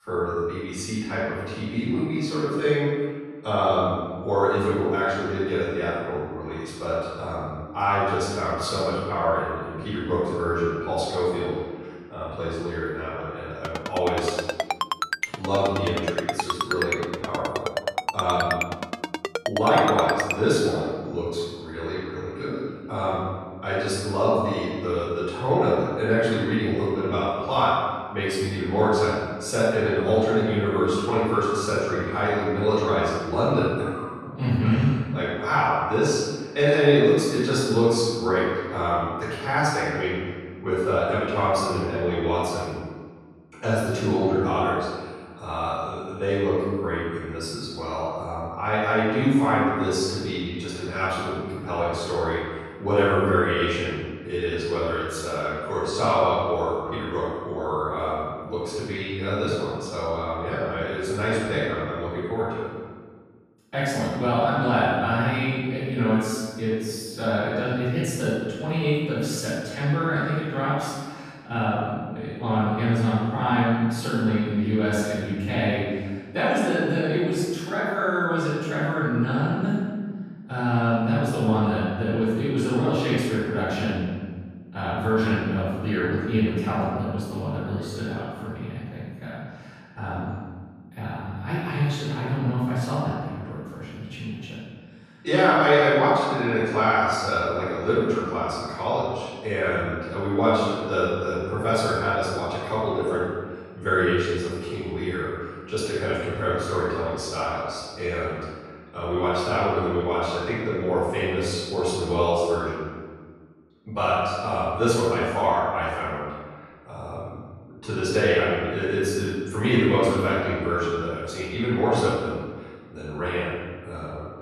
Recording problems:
room echo; strong; dies away in 1.4 s
off-mic speech; far
phone ringing; noticeable; from 14 to 20 s; peak 2 dB below the speech

